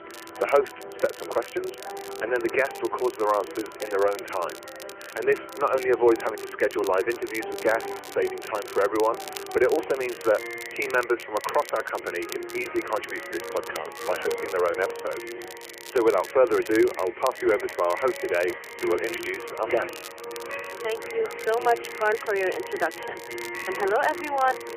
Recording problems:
phone-call audio
background music; noticeable; throughout; 10 dB below the speech
crackle, like an old record; noticeable; 15 dB below the speech
voice in the background; faint; throughout; 20 dB below the speech

